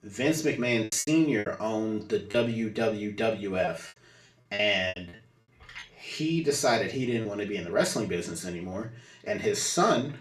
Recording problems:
off-mic speech; far
room echo; slight; dies away in 0.3 s
choppy; very; at 1 s and from 2.5 to 6 s; 9% of the speech affected

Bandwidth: 13.5 kHz